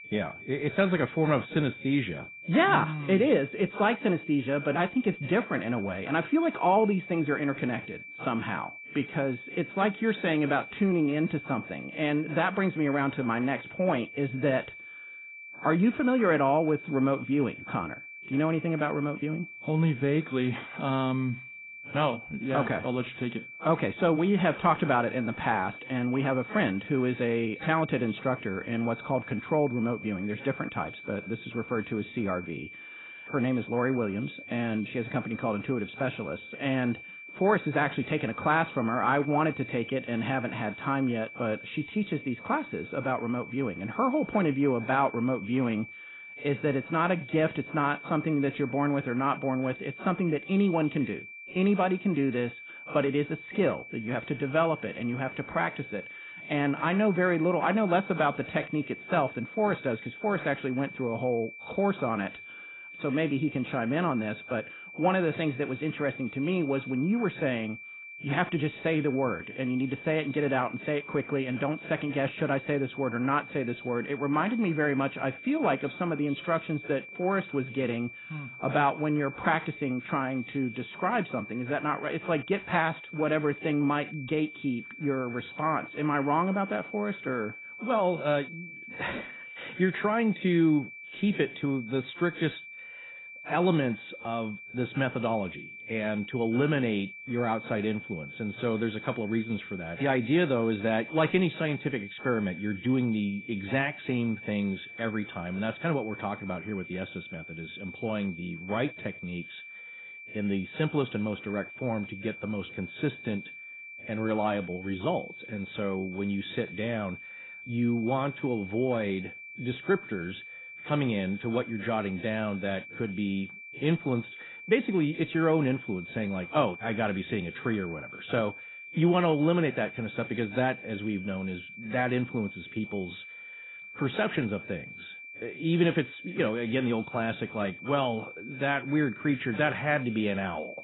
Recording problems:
garbled, watery; badly; nothing above 4 kHz
high-pitched whine; noticeable; throughout; 2.5 kHz, 15 dB below the speech

